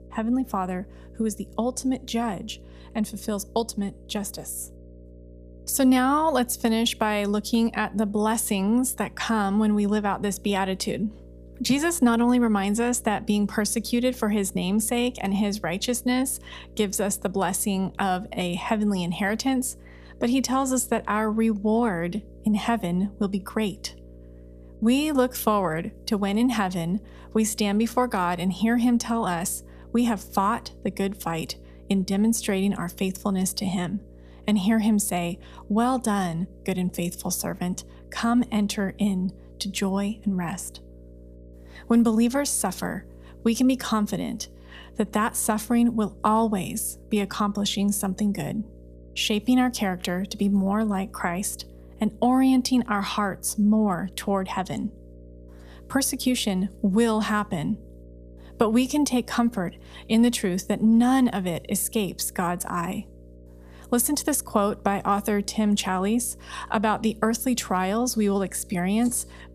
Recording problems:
electrical hum; faint; throughout; 60 Hz, 25 dB below the speech

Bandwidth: 14.5 kHz